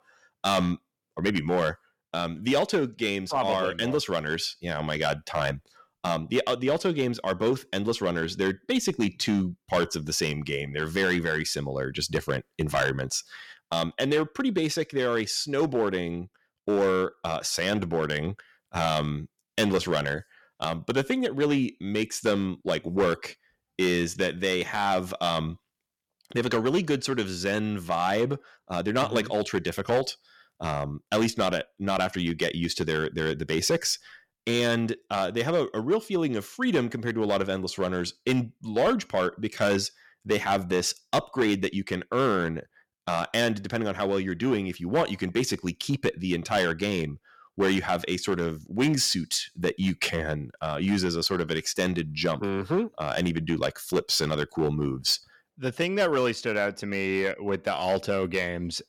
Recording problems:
distortion; slight; 4% of the sound clipped

